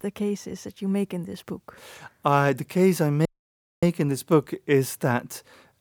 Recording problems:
audio cutting out; at 3.5 s for 0.5 s

